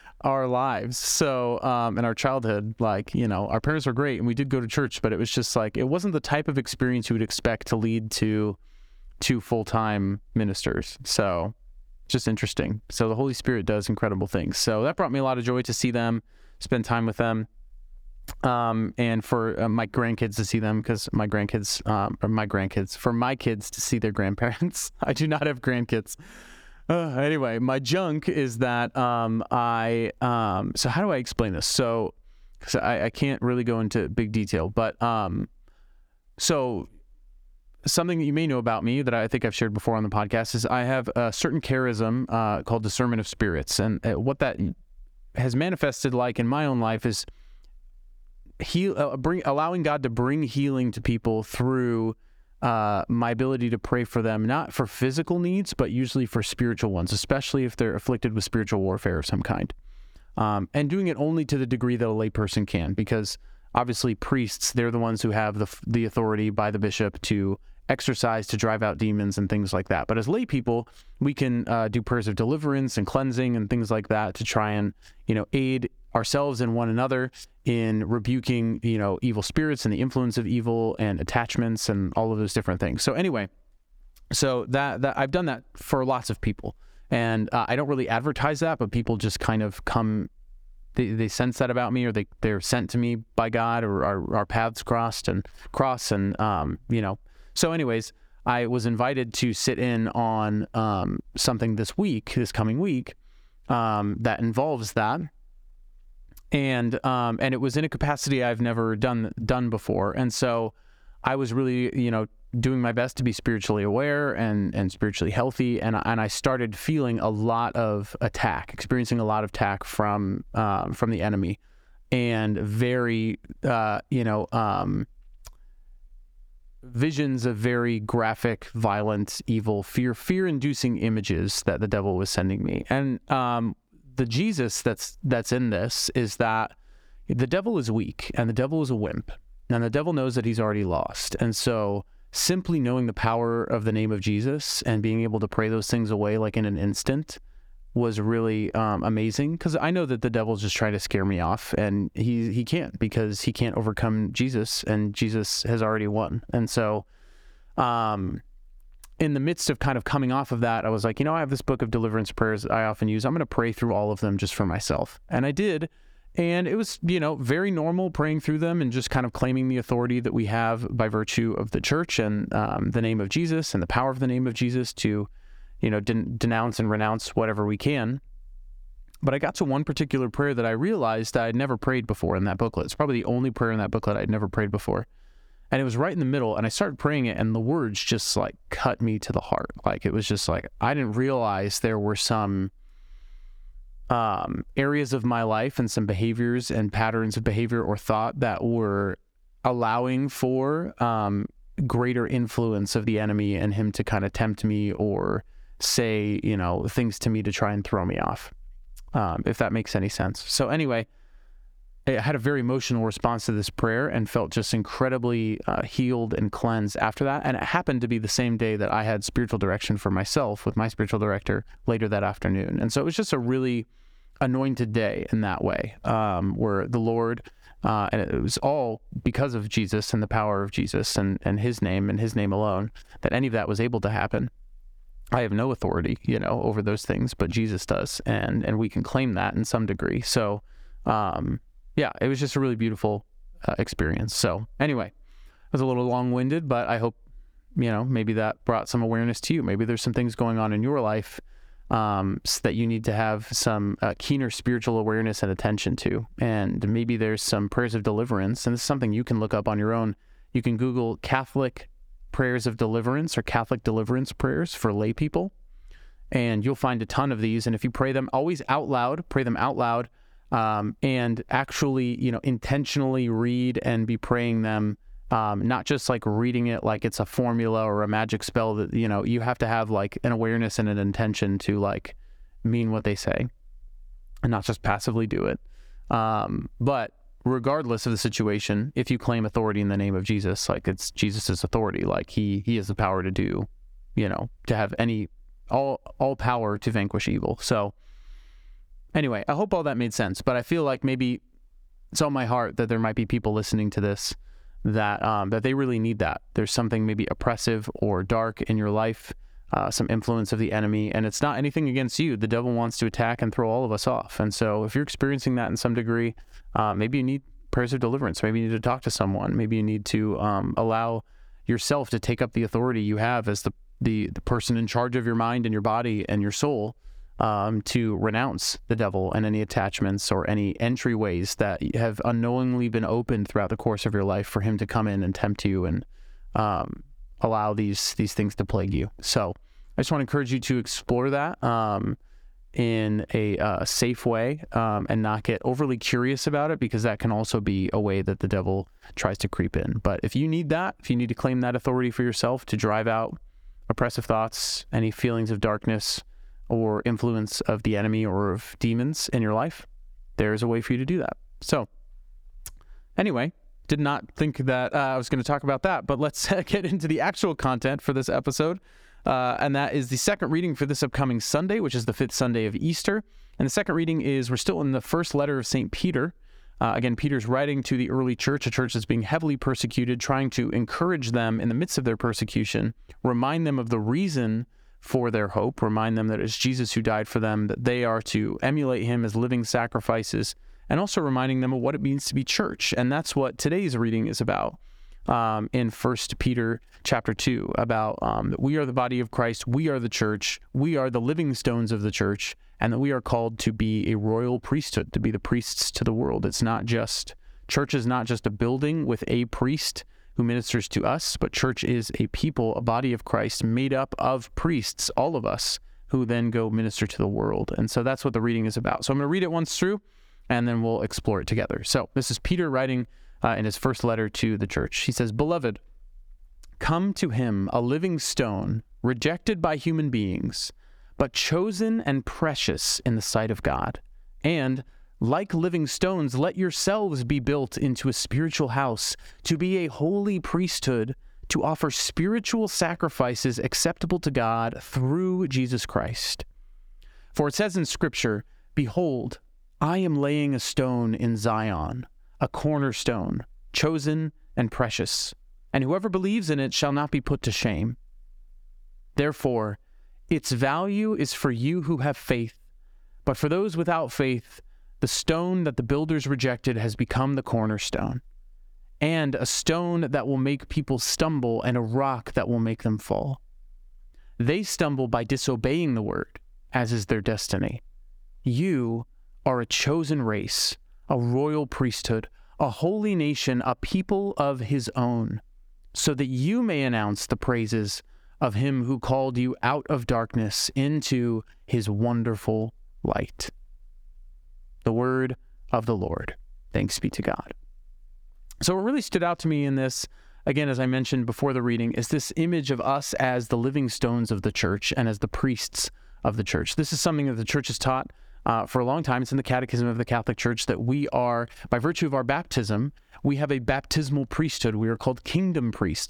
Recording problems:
squashed, flat; somewhat

